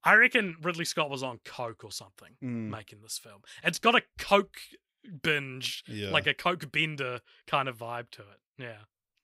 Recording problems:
none

